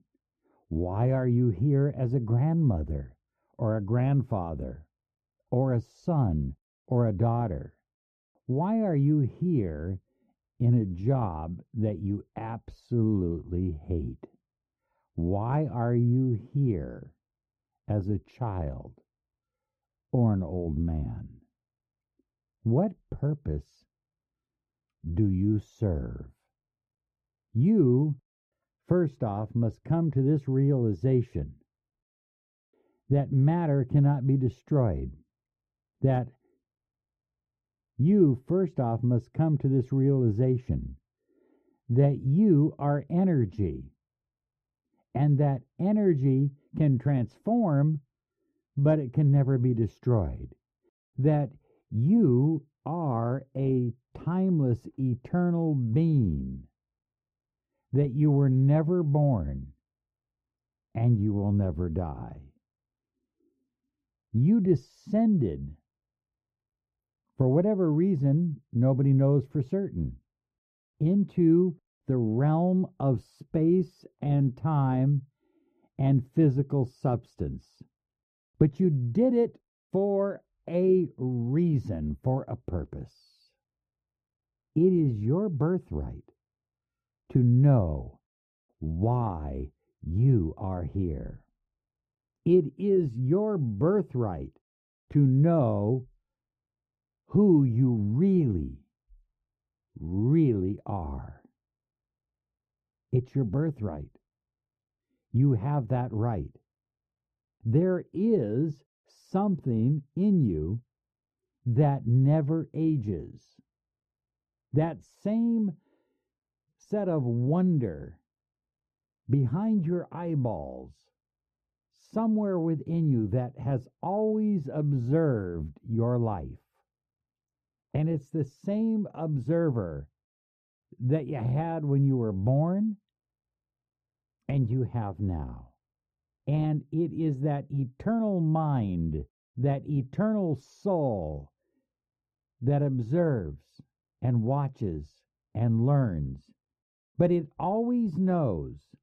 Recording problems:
muffled; very; fading above 1.5 kHz

